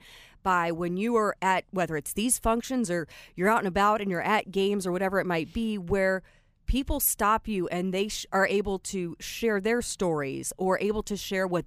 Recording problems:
none

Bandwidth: 15 kHz